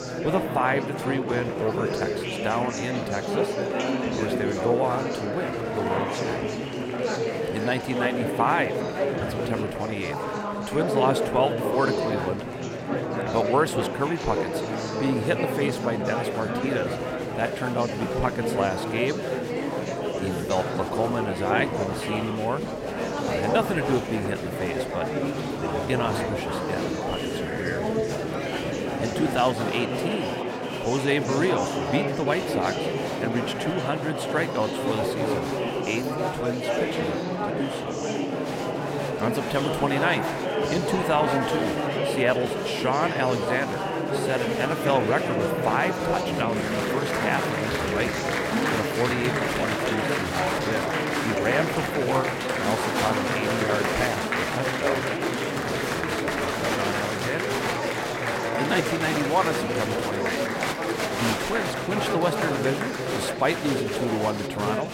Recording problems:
murmuring crowd; very loud; throughout; 1 dB above the speech

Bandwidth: 16 kHz